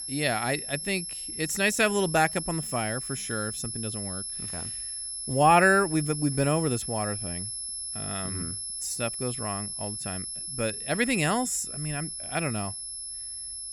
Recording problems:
high-pitched whine; loud; throughout; 11 kHz, 5 dB below the speech

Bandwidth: 18.5 kHz